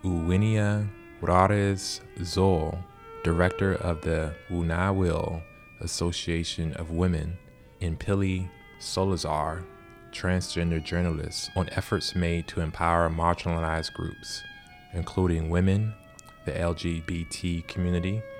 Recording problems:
background music; noticeable; throughout; 20 dB below the speech

